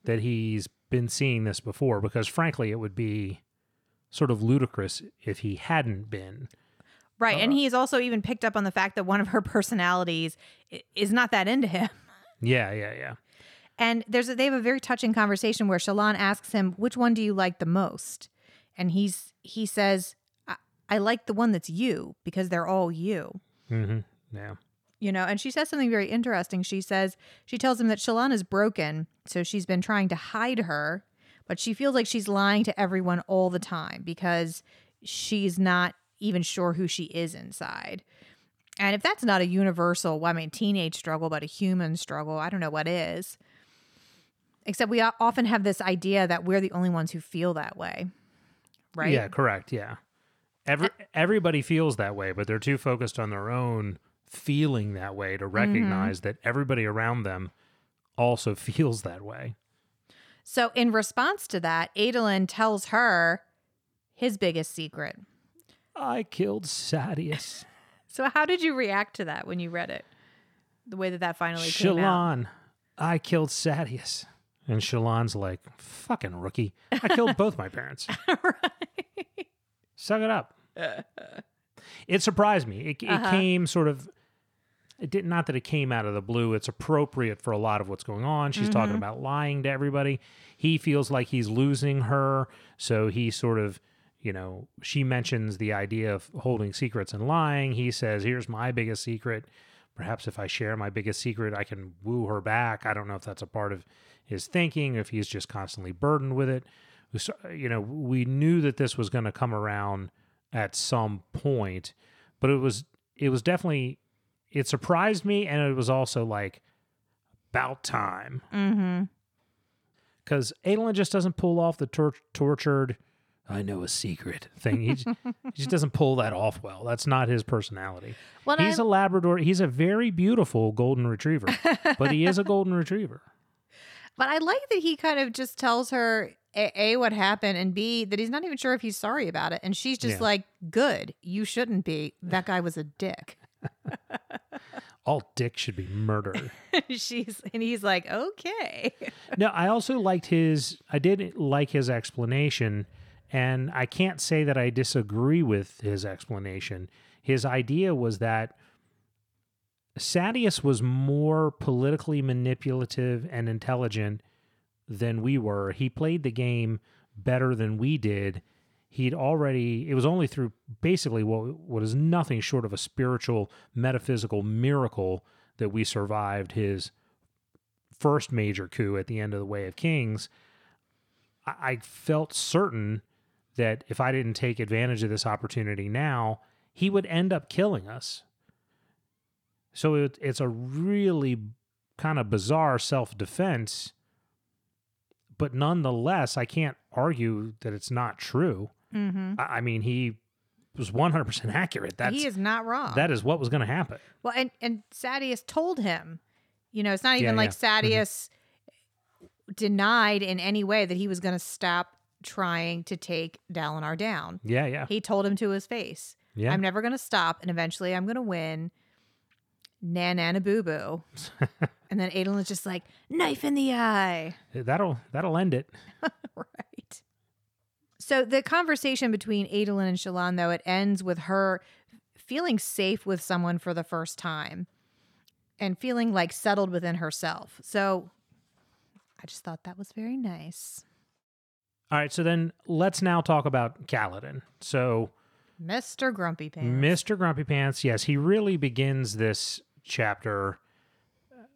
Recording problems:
none

